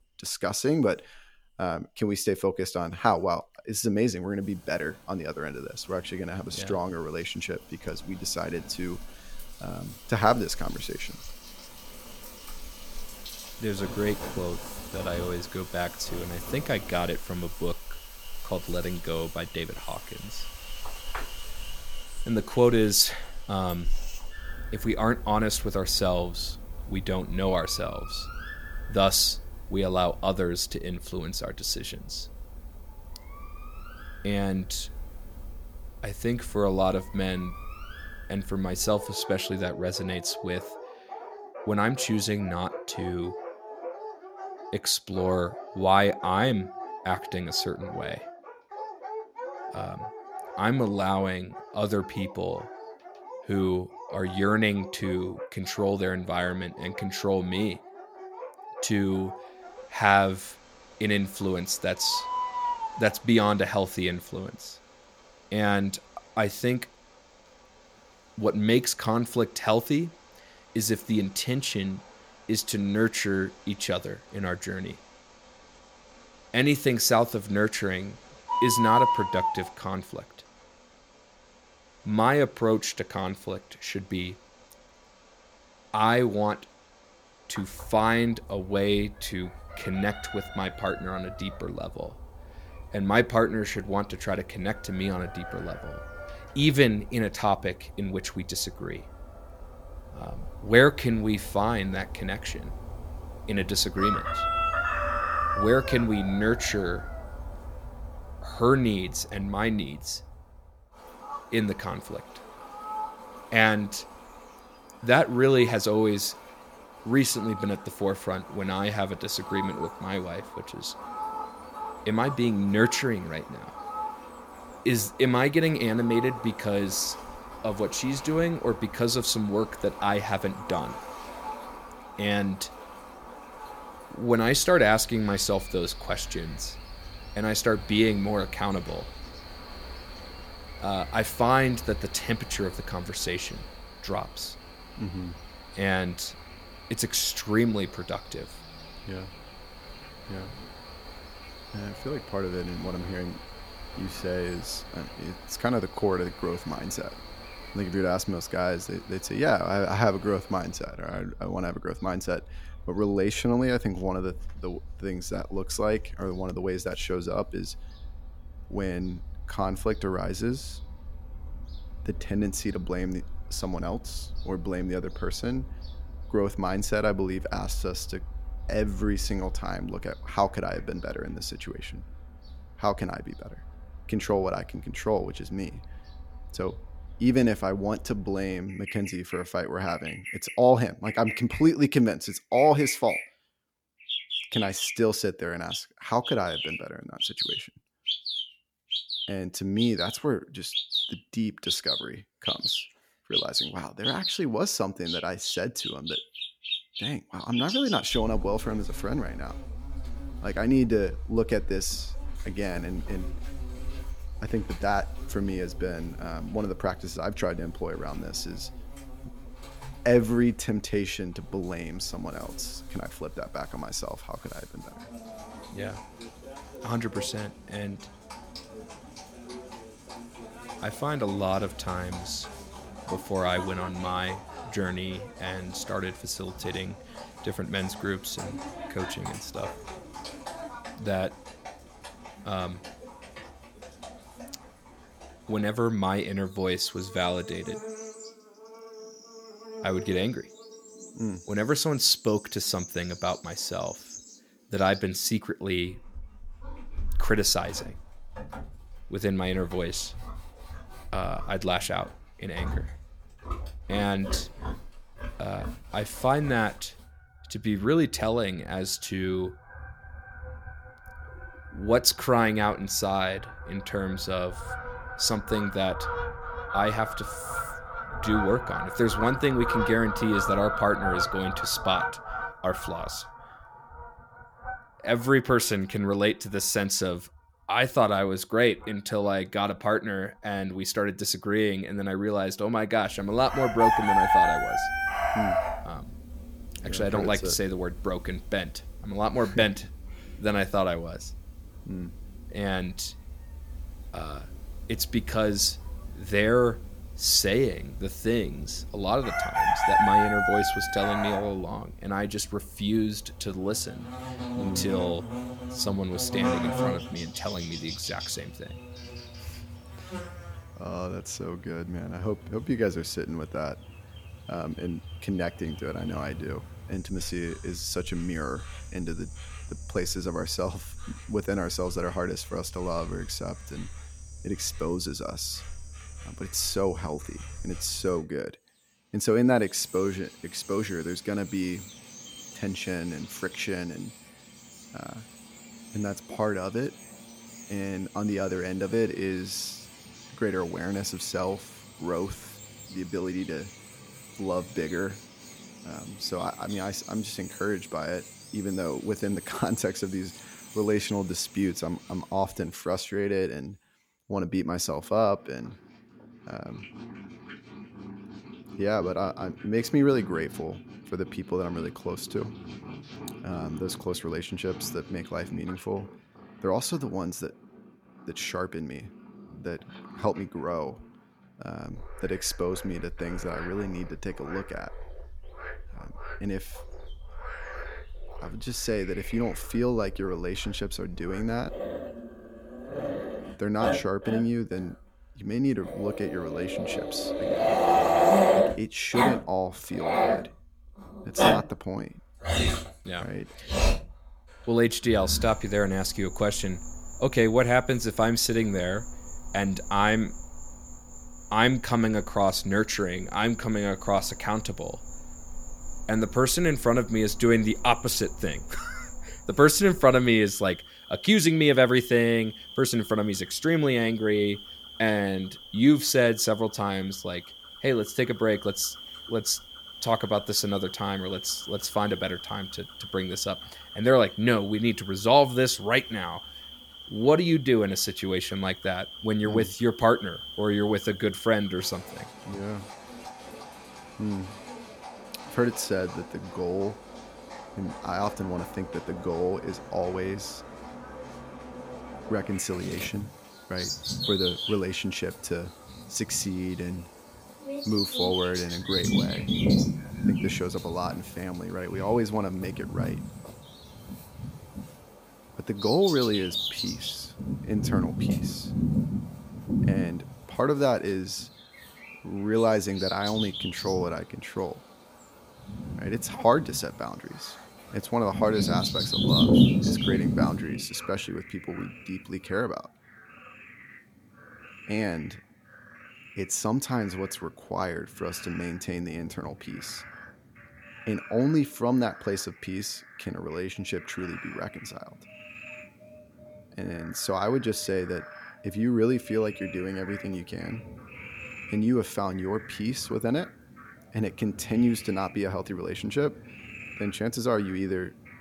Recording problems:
animal sounds; loud; throughout; 7 dB below the speech

